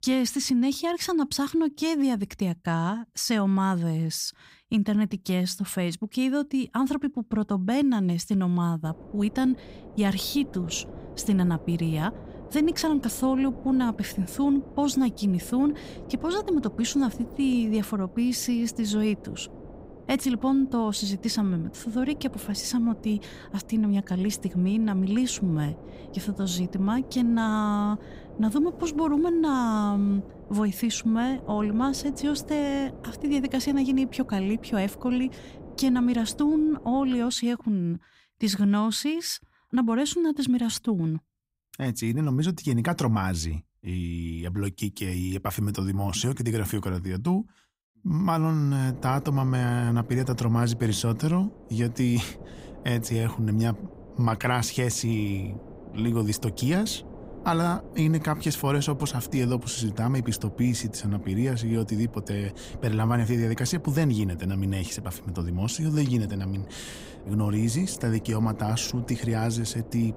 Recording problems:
wind noise on the microphone; occasional gusts; from 9 to 37 s and from 49 s on; 15 dB below the speech

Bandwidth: 15.5 kHz